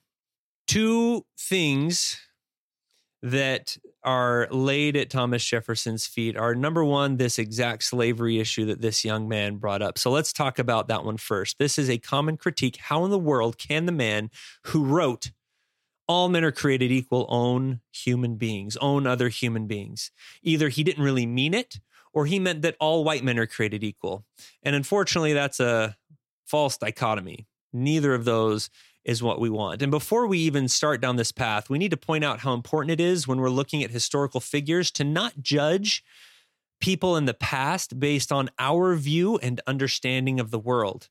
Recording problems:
none

